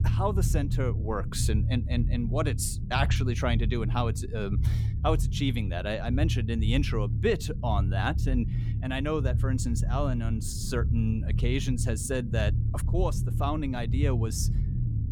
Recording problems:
low rumble; noticeable; throughout; 10 dB below the speech

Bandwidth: 18 kHz